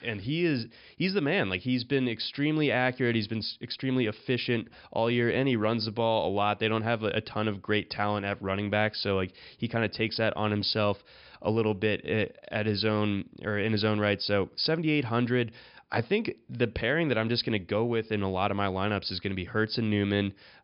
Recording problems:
high frequencies cut off; noticeable; nothing above 5.5 kHz

